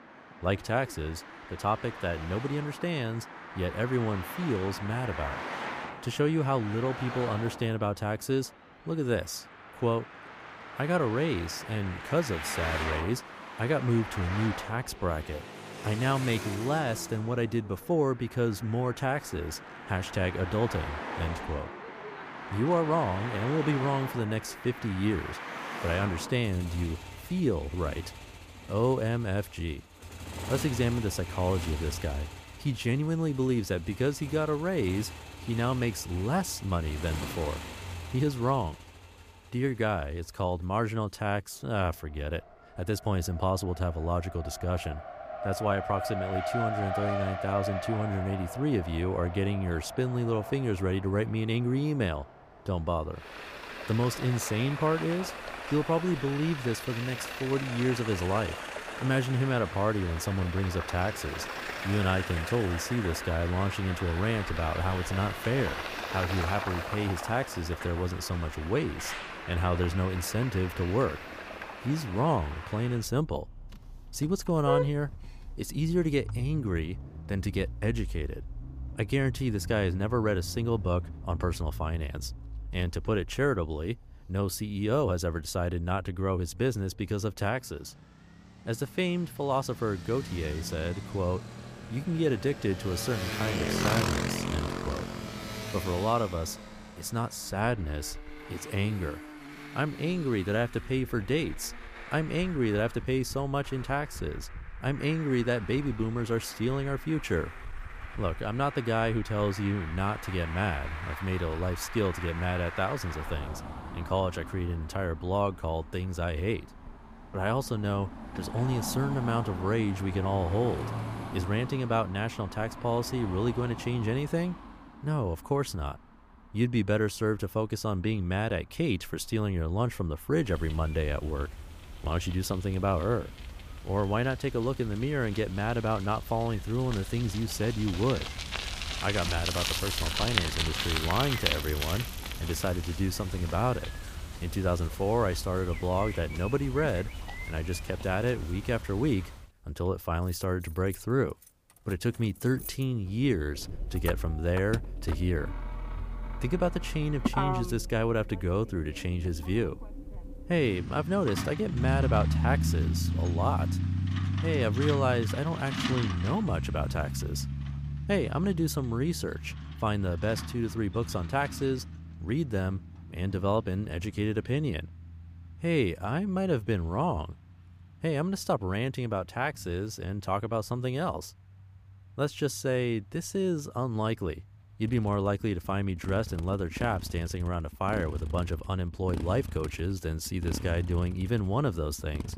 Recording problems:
traffic noise; loud; throughout; 7 dB below the speech

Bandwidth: 15 kHz